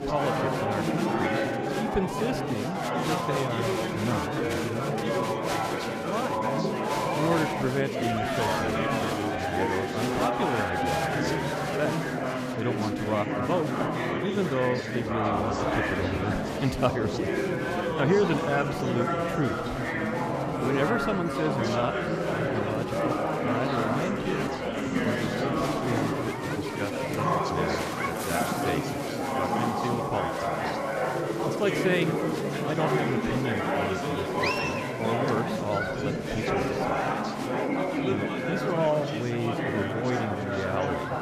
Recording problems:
chatter from many people; very loud; throughout; 4 dB above the speech

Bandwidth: 14.5 kHz